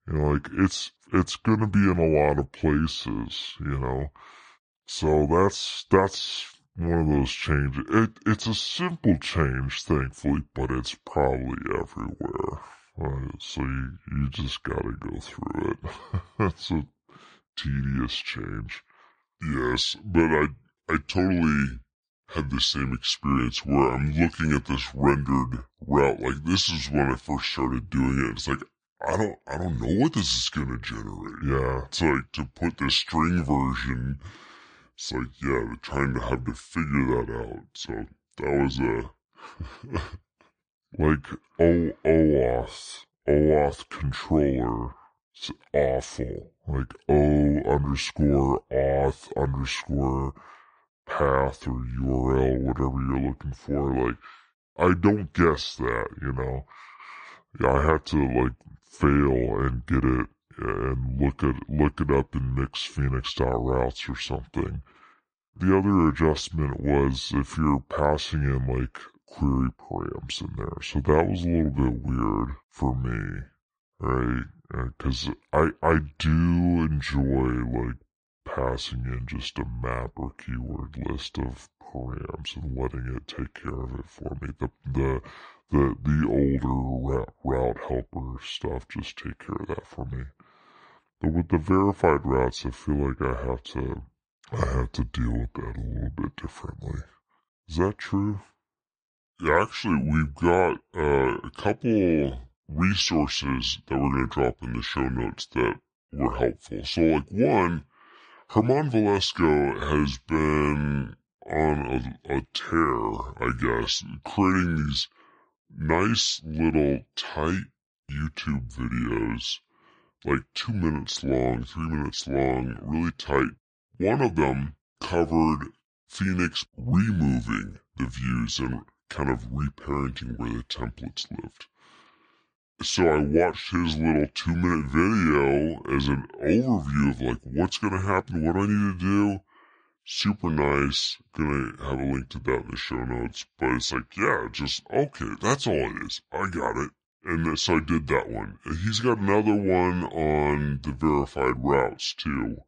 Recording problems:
wrong speed and pitch; too slow and too low; 0.7 times normal speed

